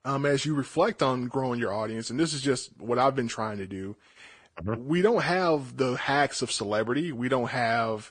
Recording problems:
garbled, watery; slightly; nothing above 9 kHz

